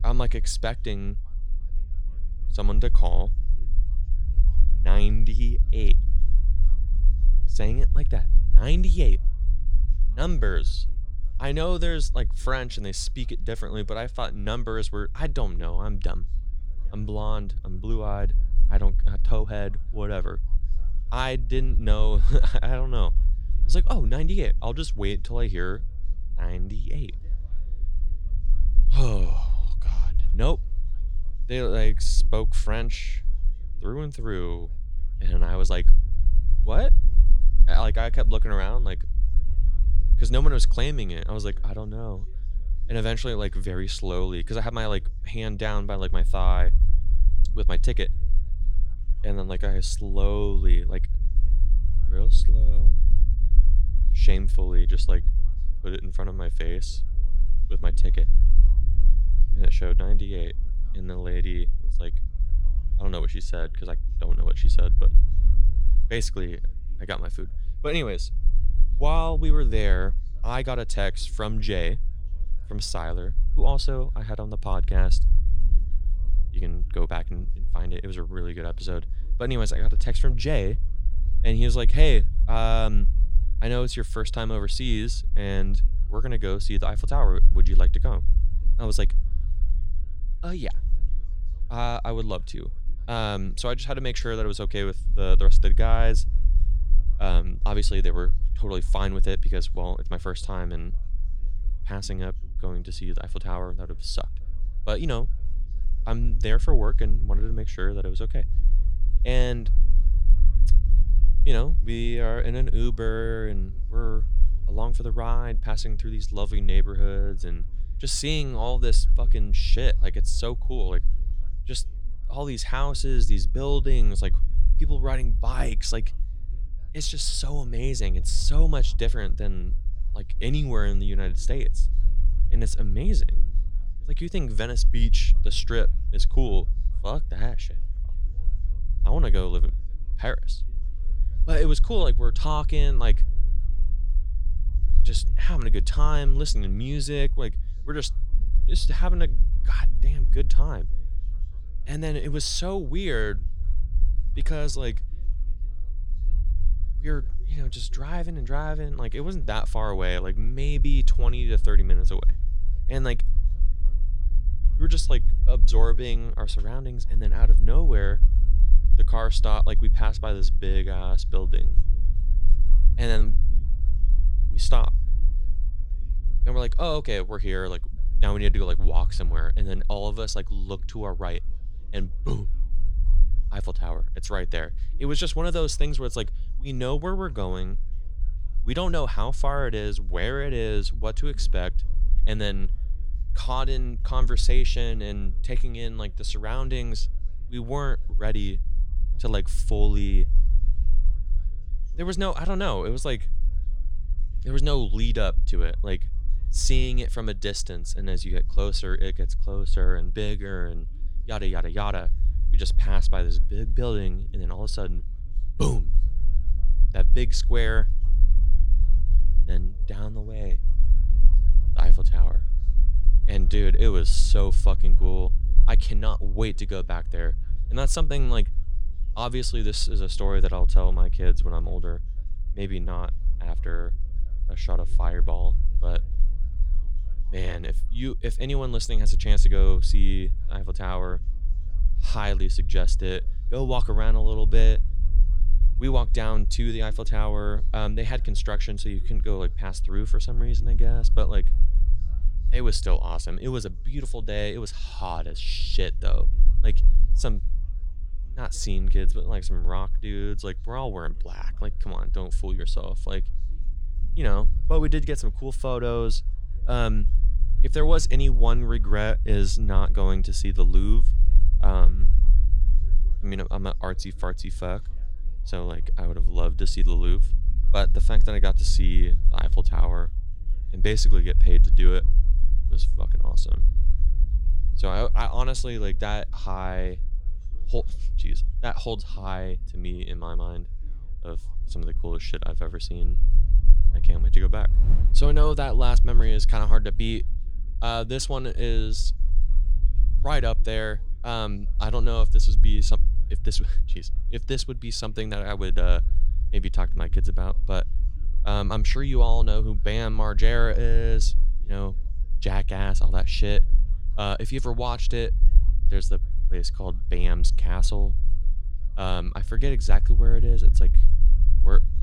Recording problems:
low rumble; noticeable; throughout; 20 dB below the speech
background chatter; faint; throughout; 4 voices, 30 dB below the speech

